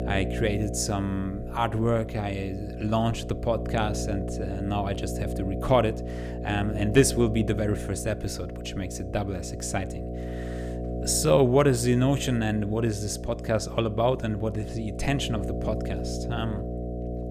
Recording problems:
electrical hum; loud; throughout; 60 Hz, 9 dB below the speech

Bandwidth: 14.5 kHz